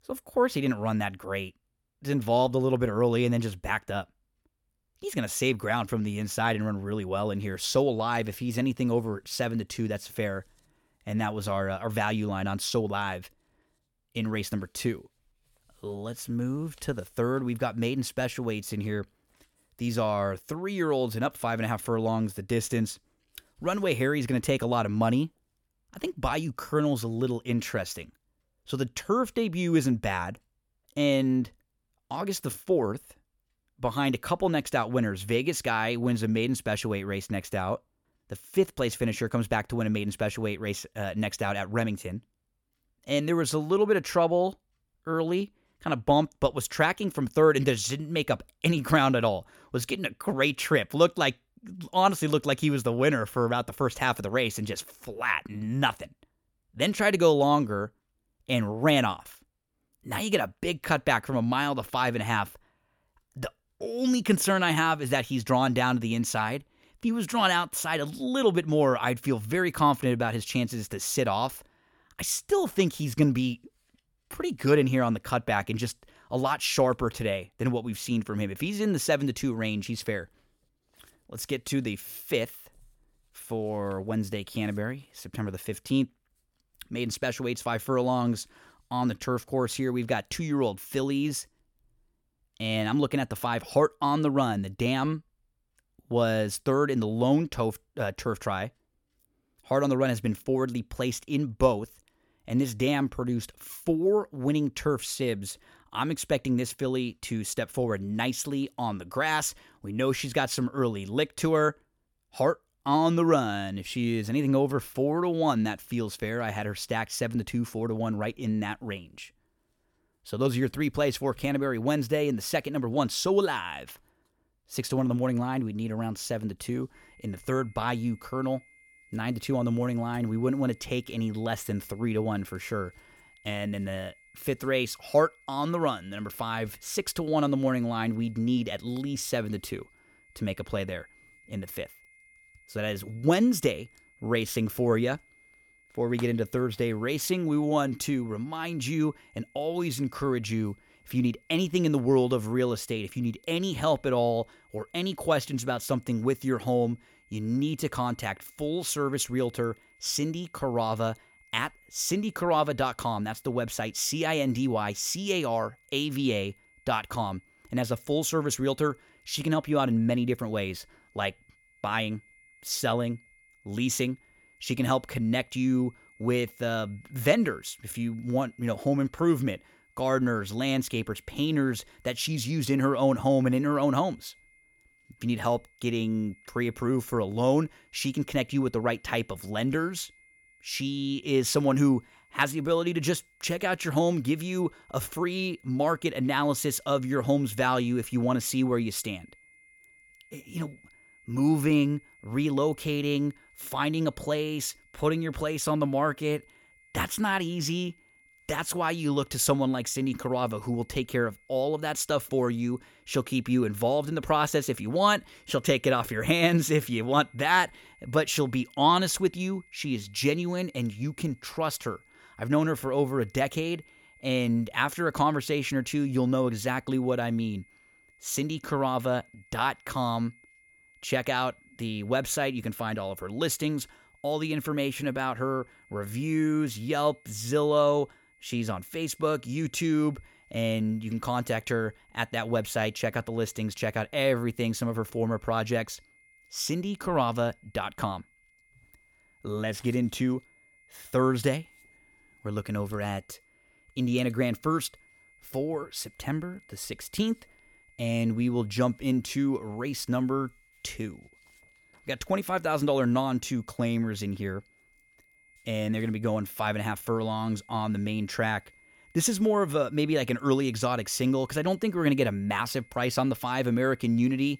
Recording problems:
high-pitched whine; faint; from 2:07 on; 2 kHz, 30 dB below the speech

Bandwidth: 18 kHz